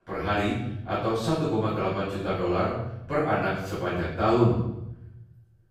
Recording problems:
off-mic speech; far
room echo; noticeable; dies away in 0.8 s

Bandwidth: 15.5 kHz